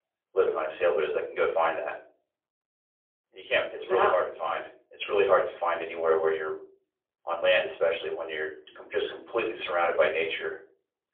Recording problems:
phone-call audio; poor line; nothing above 3.5 kHz
off-mic speech; far
room echo; slight; dies away in 0.5 s

